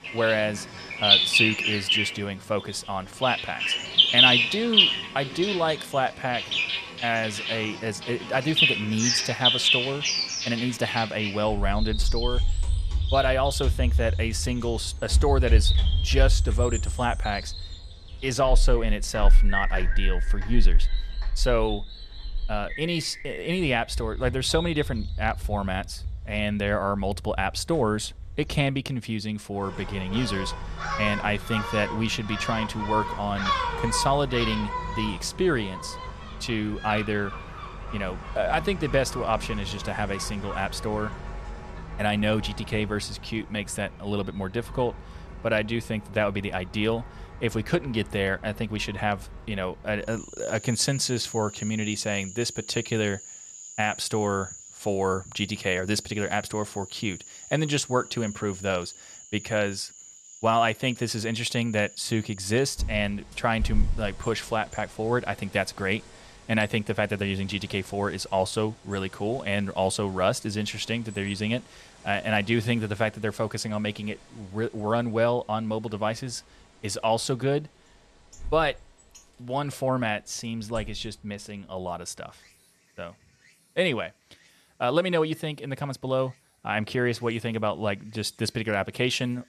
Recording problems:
animal sounds; very loud; throughout; 1 dB above the speech

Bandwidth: 13.5 kHz